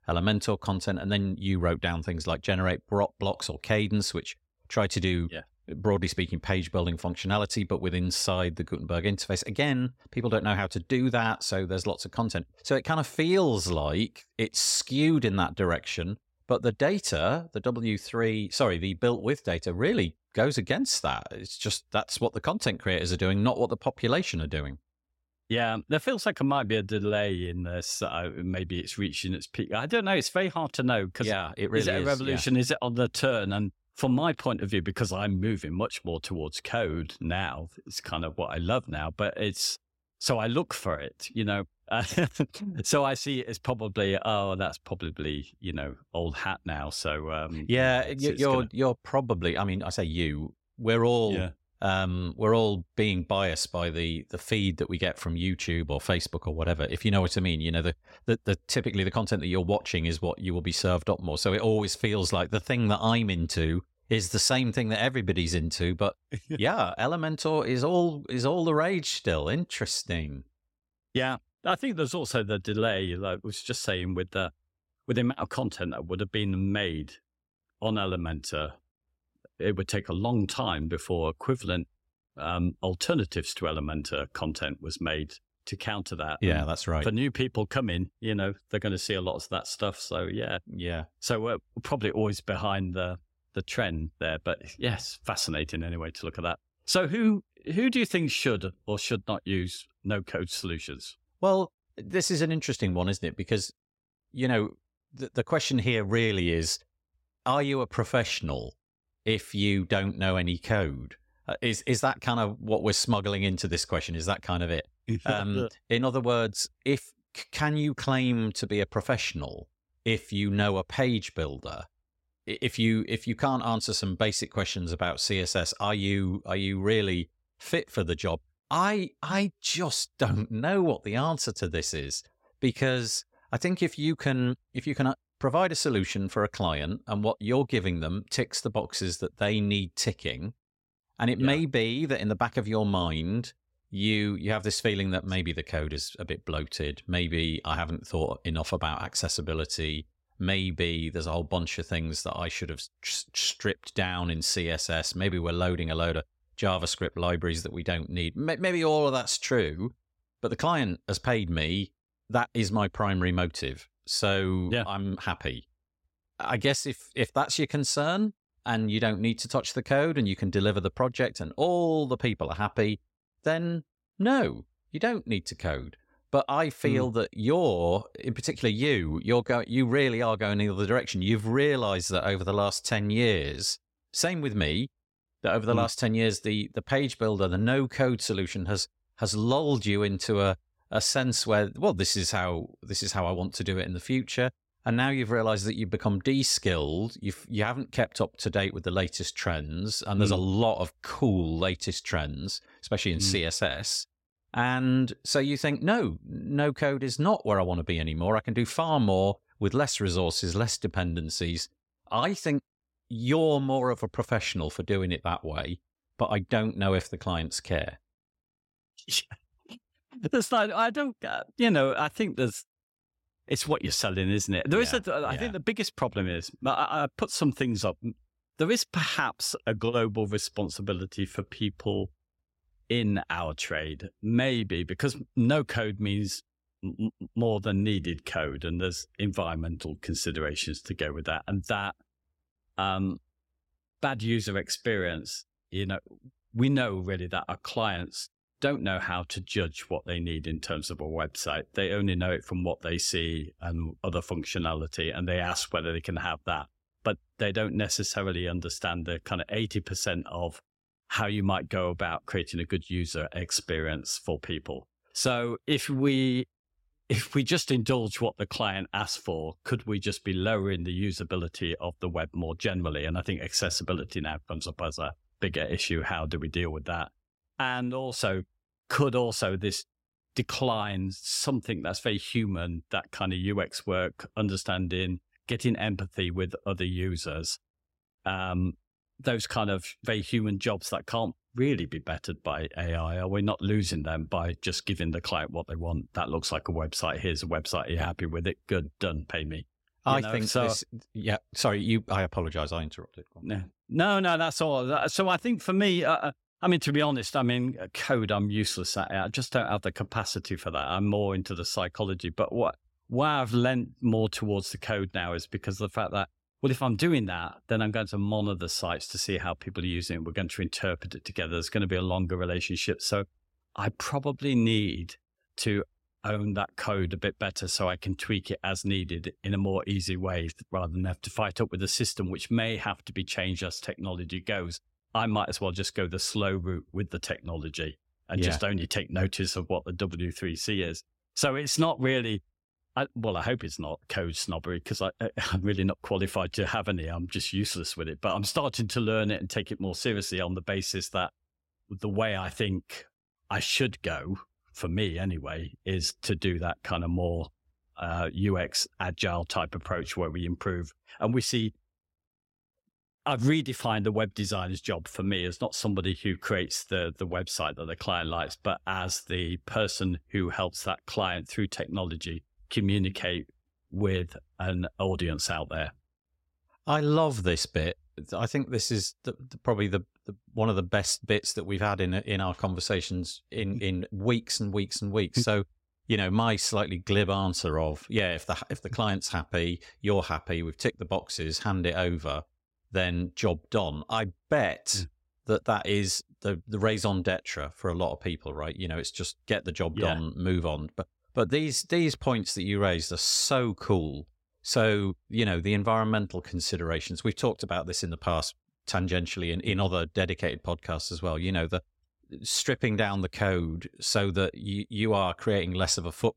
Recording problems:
none

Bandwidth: 16 kHz